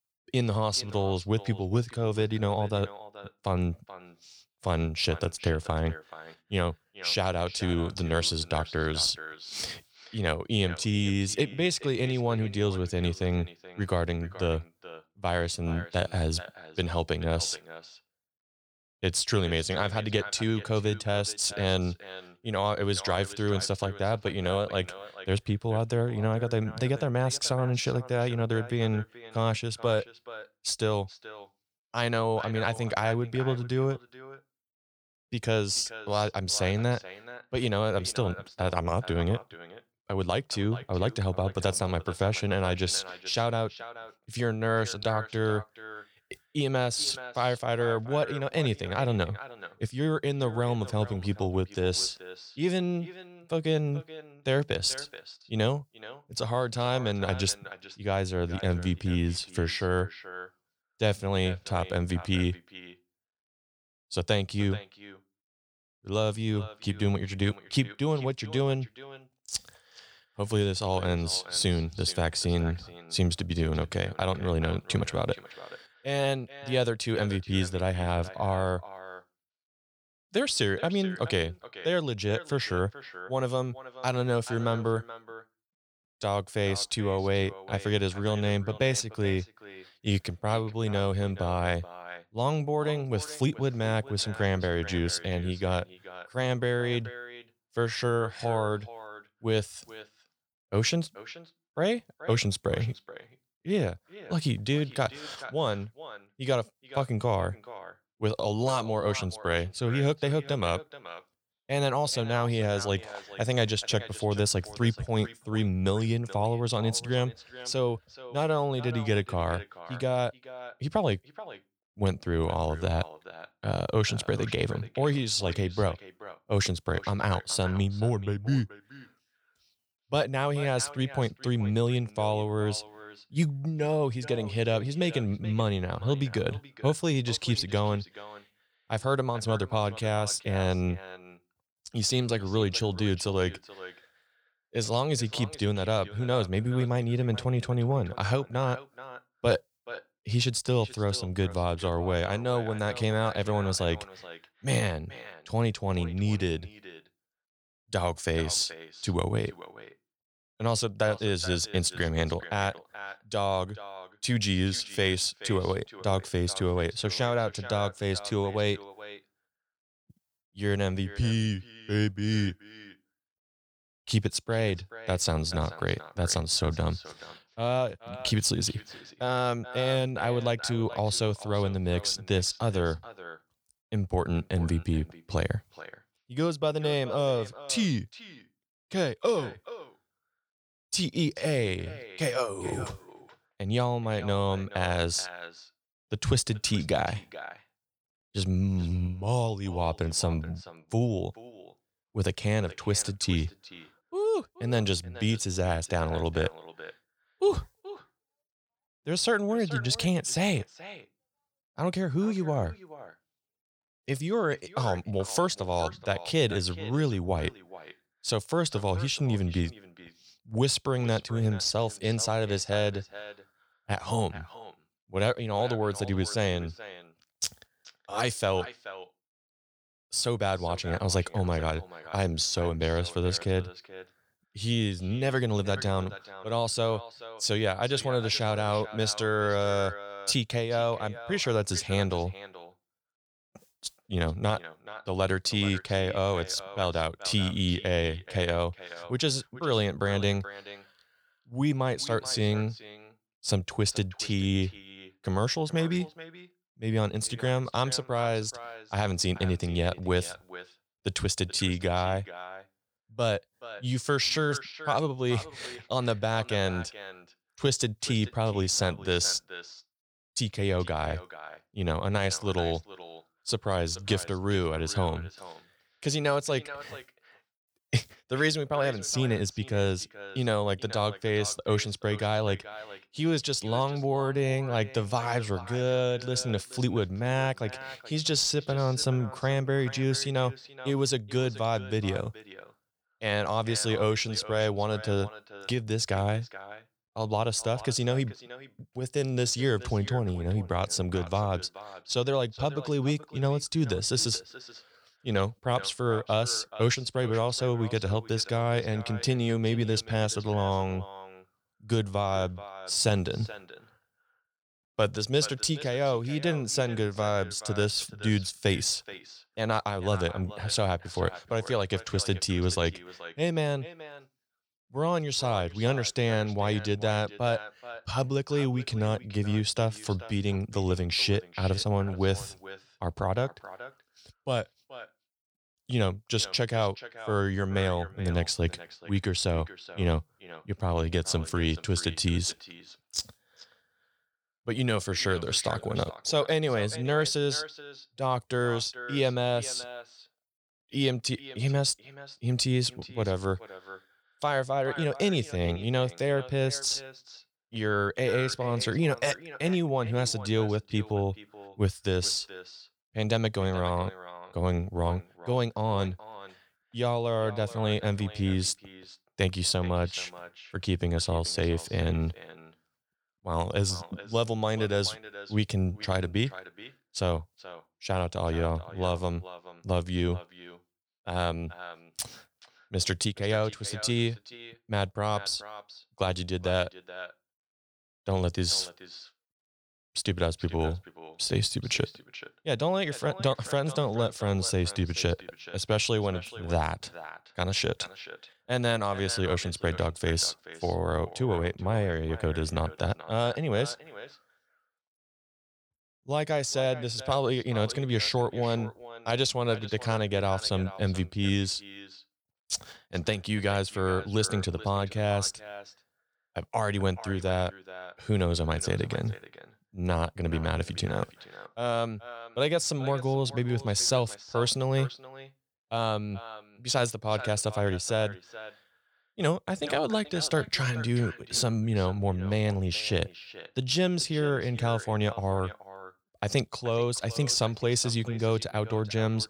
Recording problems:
echo of what is said; noticeable; throughout; 430 ms later, 15 dB below the speech

